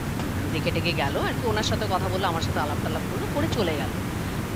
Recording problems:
hiss; loud; throughout; as loud as the speech

